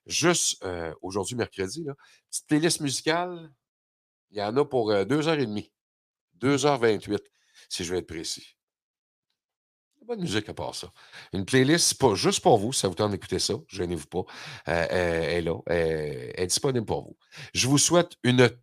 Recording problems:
none

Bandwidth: 15 kHz